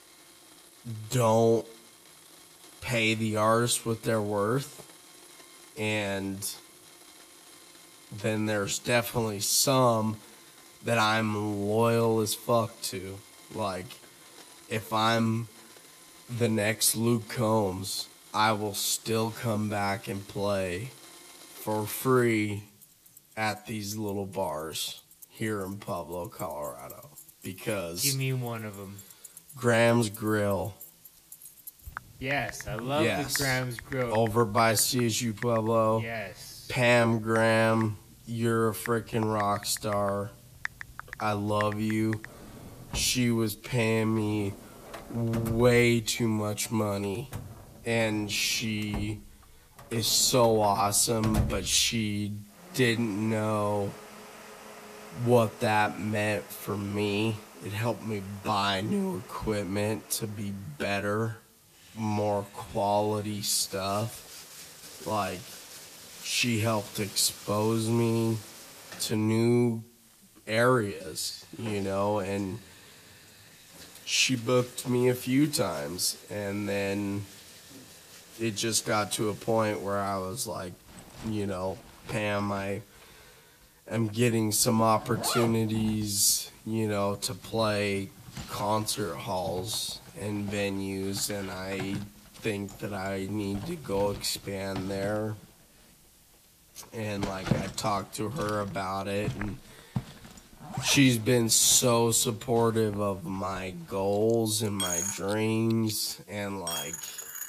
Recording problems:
wrong speed, natural pitch; too slow; 0.6 times normal speed
household noises; noticeable; throughout; 15 dB below the speech
hiss; faint; throughout; 30 dB below the speech

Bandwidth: 14.5 kHz